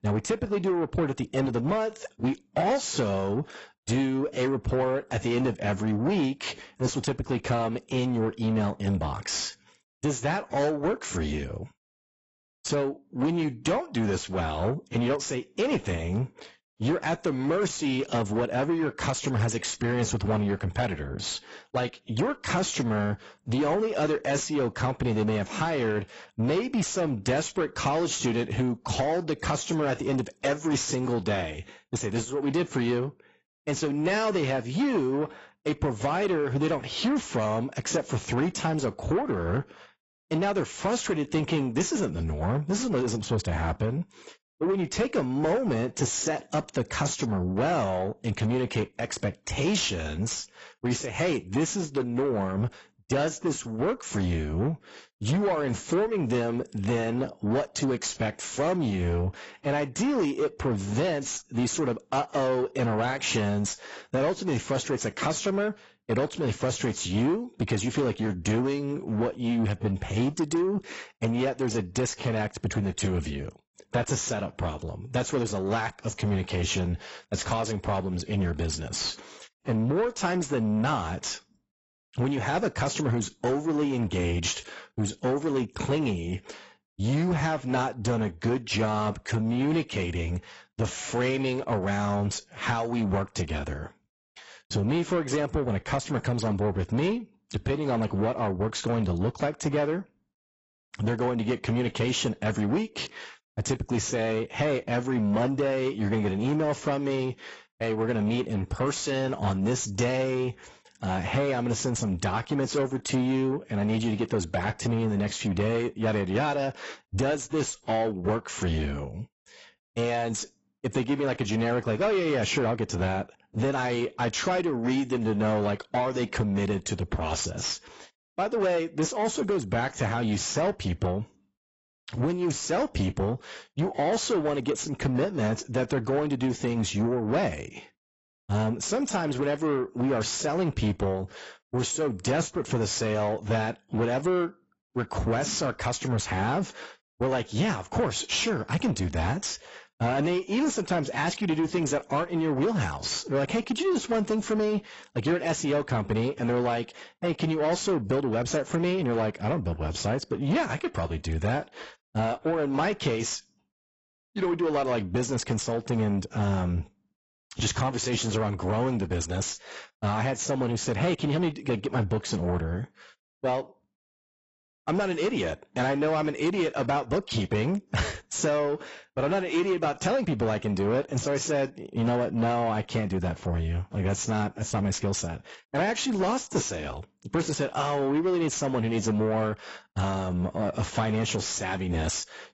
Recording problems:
garbled, watery; badly; nothing above 8 kHz
distortion; slight; 10 dB below the speech

